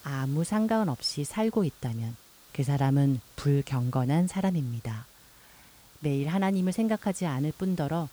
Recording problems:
hiss; faint; throughout; 25 dB below the speech

